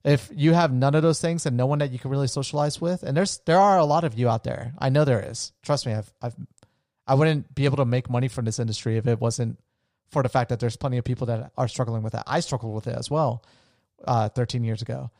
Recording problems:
none

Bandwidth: 15 kHz